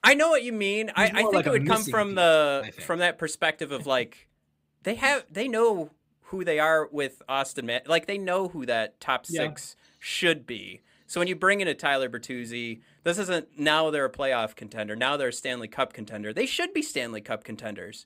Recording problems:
none

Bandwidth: 15.5 kHz